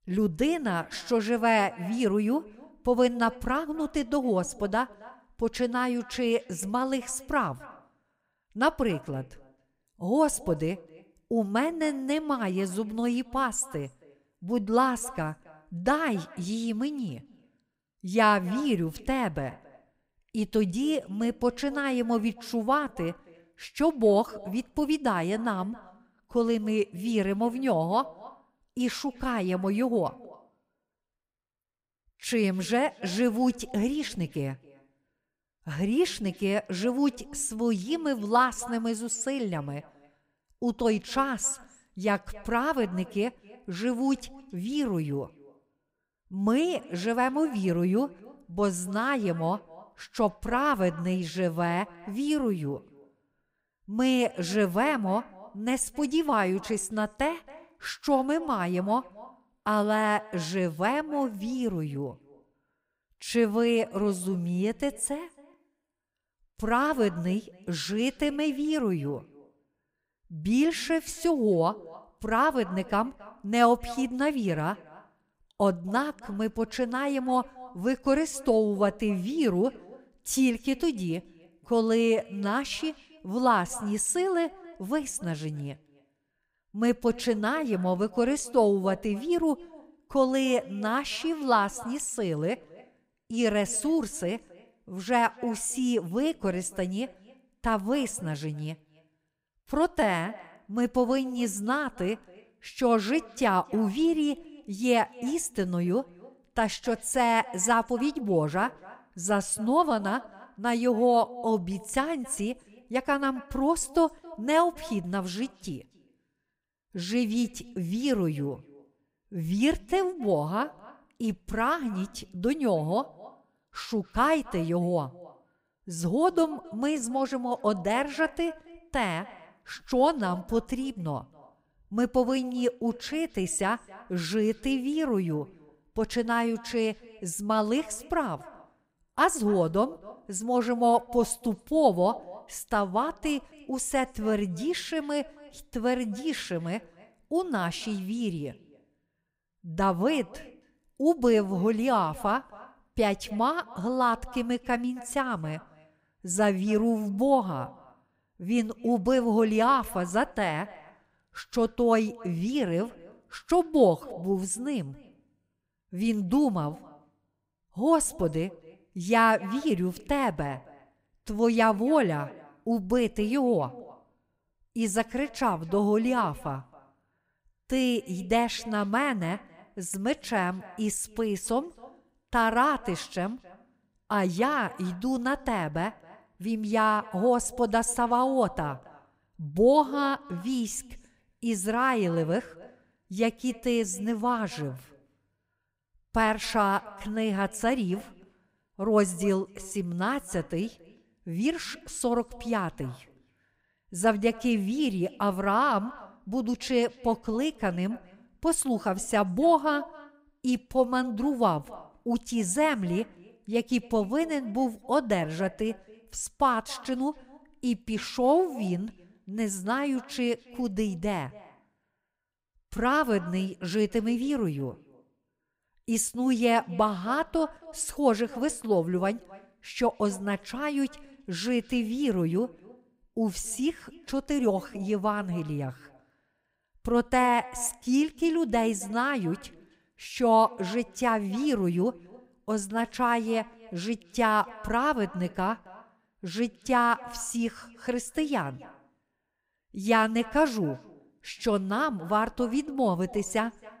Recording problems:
echo of what is said; faint; throughout; 270 ms later, 20 dB below the speech

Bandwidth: 15.5 kHz